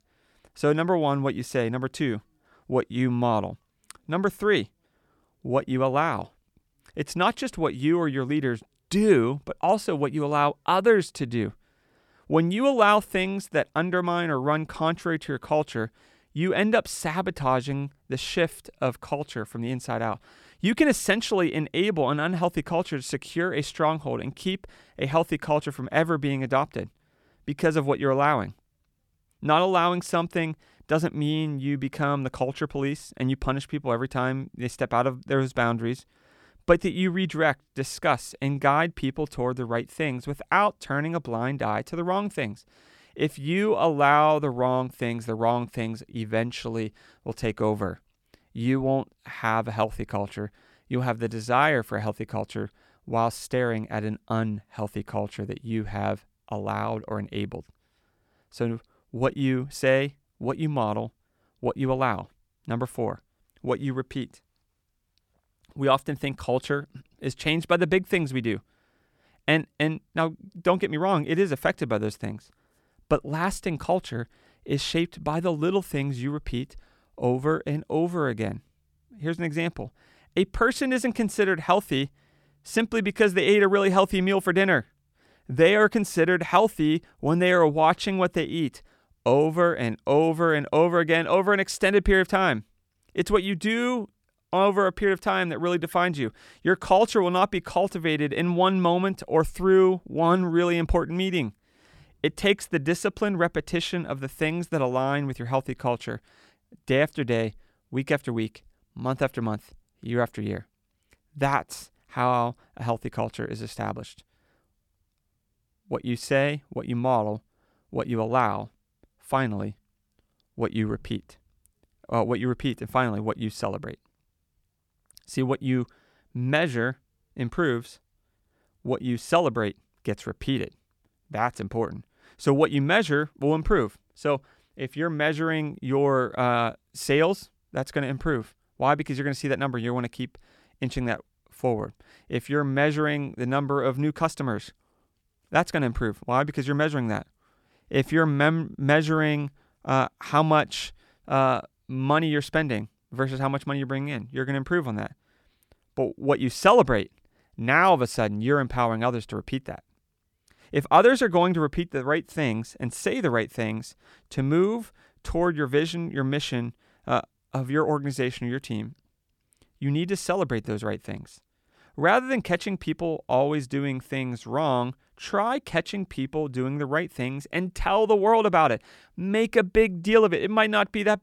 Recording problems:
none

